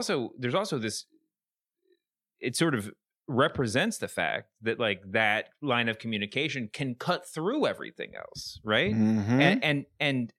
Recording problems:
abrupt cut into speech; at the start

